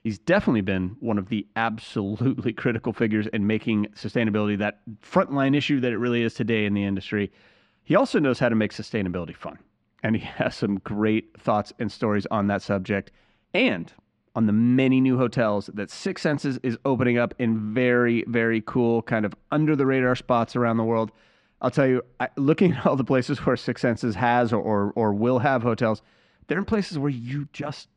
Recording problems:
muffled; slightly; fading above 3 kHz

